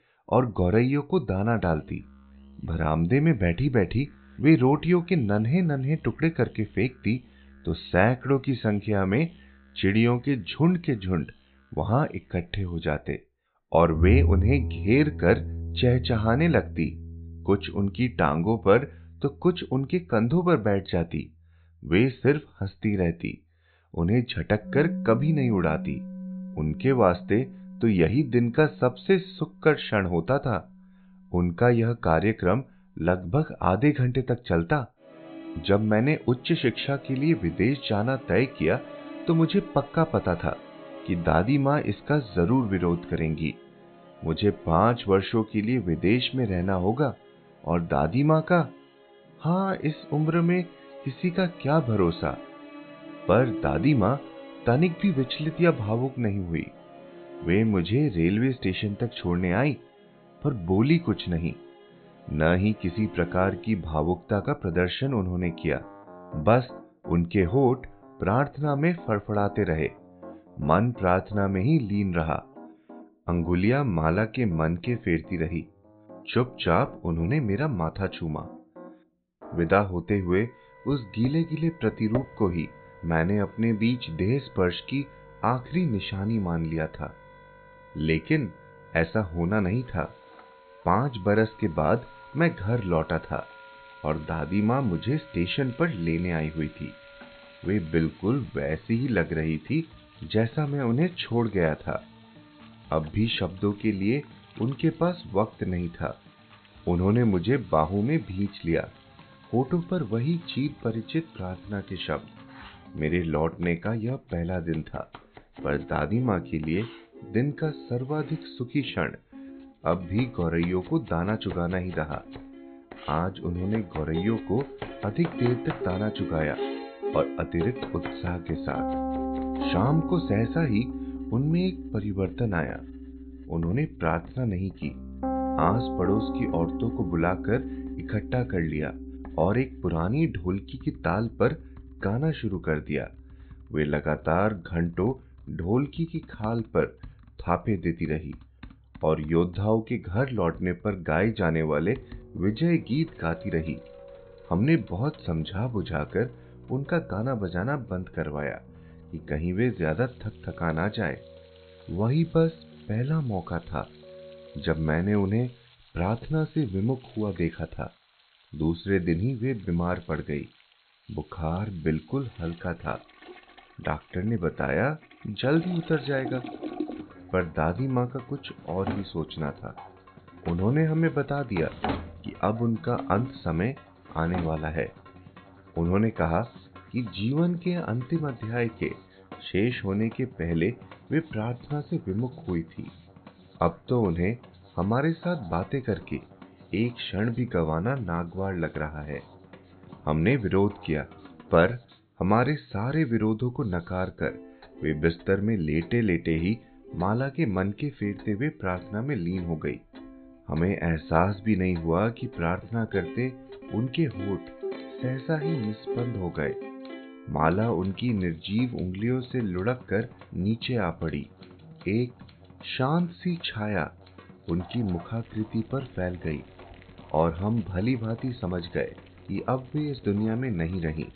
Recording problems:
high frequencies cut off; severe; nothing above 4 kHz
background music; noticeable; throughout; 15 dB below the speech
household noises; faint; from 1:21 on; 20 dB below the speech

